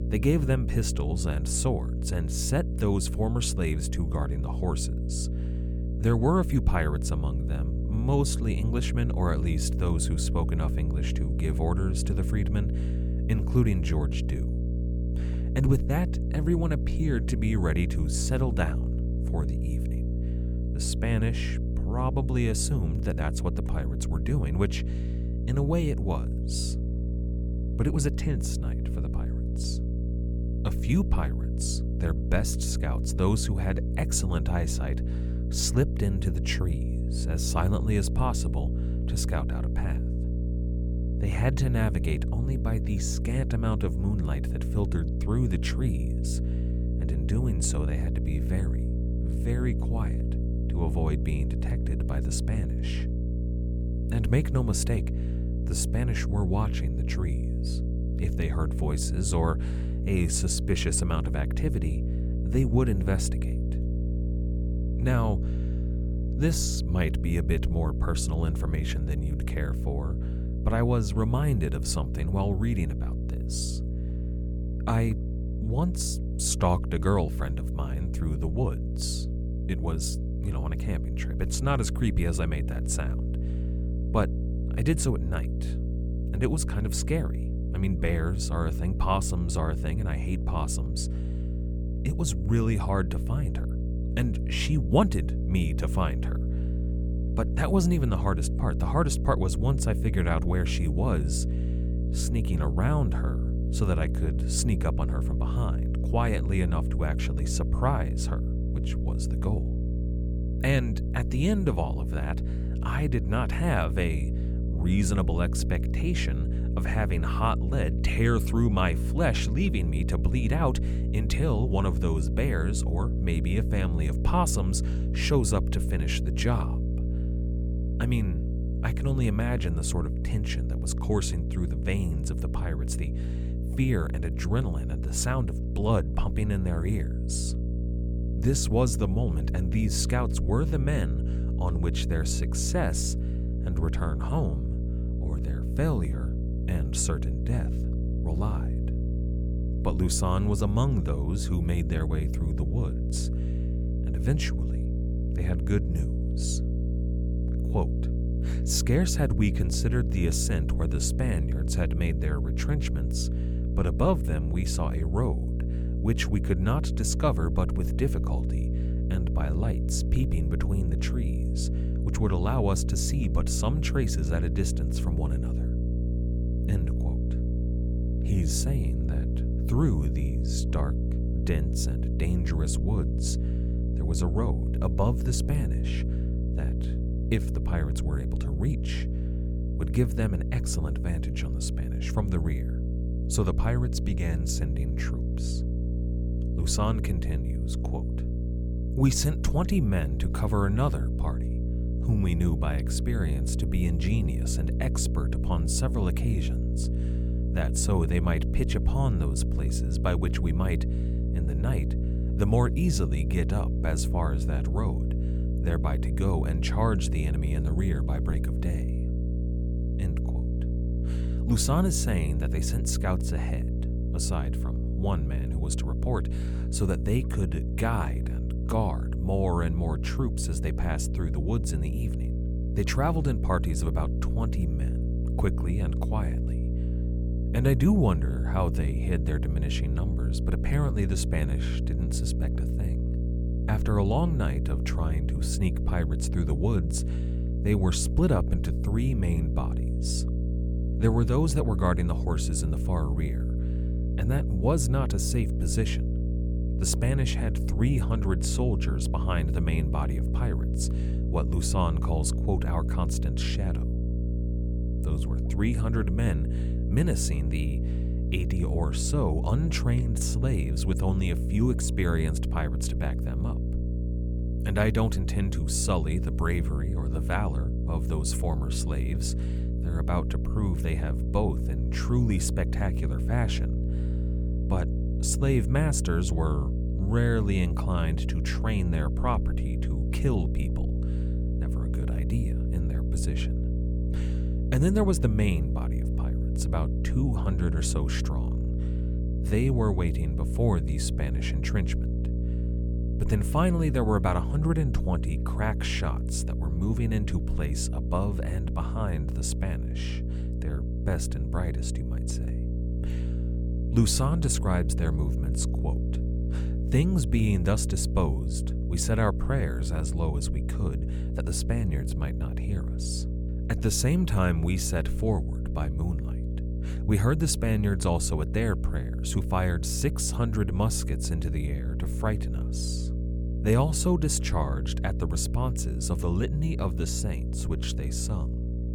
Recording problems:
electrical hum; loud; throughout; 60 Hz, 8 dB below the speech

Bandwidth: 18 kHz